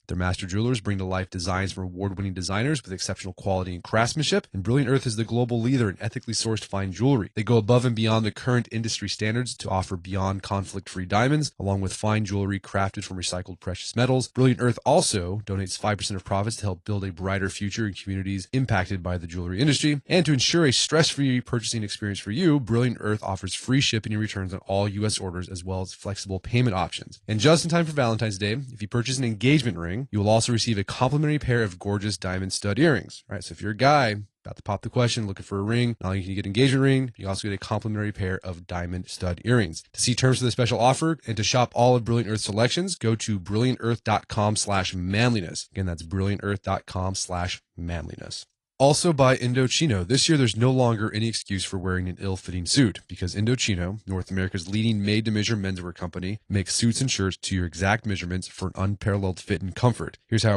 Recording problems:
garbled, watery; slightly
abrupt cut into speech; at the end

